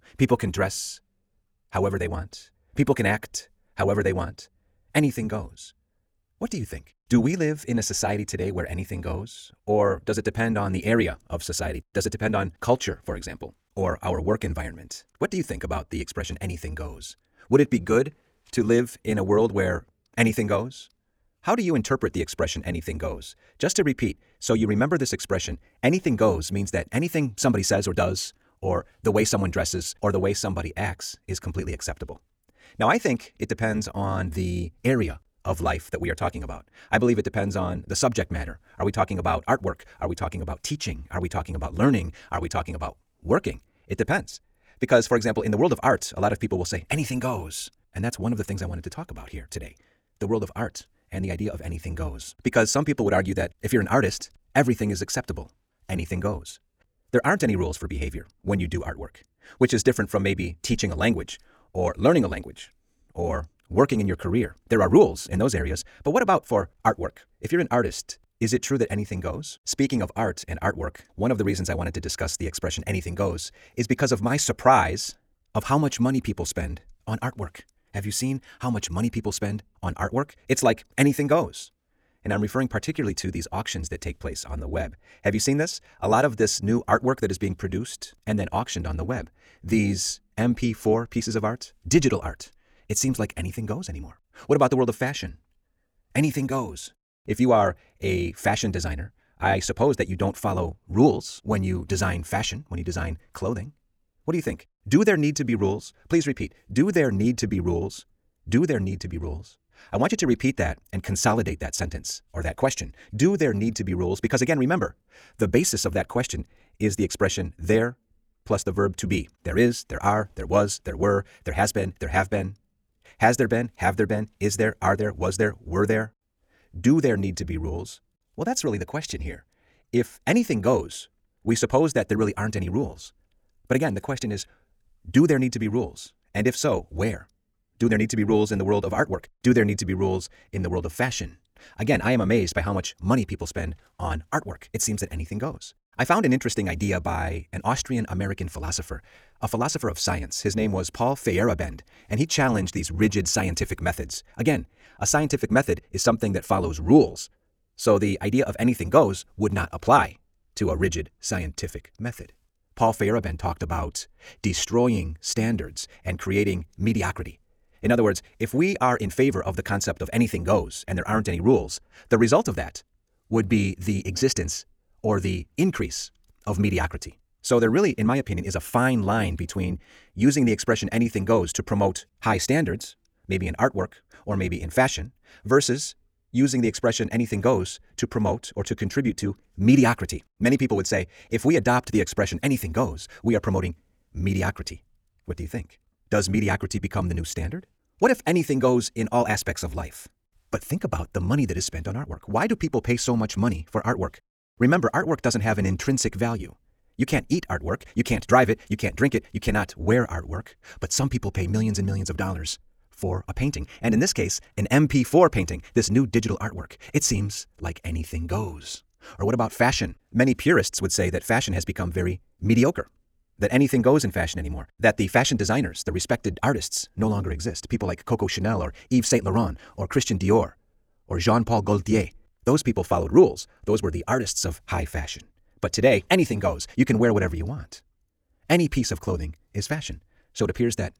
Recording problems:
wrong speed, natural pitch; too fast; 1.6 times normal speed

